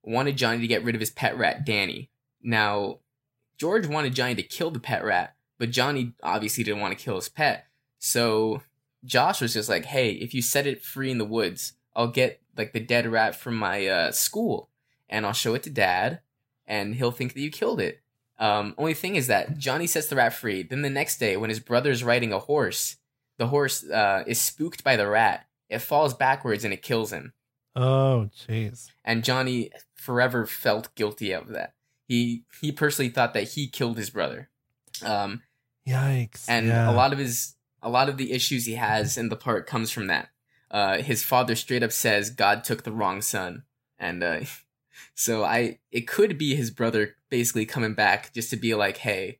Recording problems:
none

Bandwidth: 16 kHz